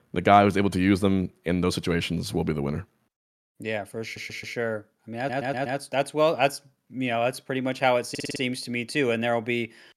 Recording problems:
audio stuttering; at 4 s, at 5 s and at 8 s

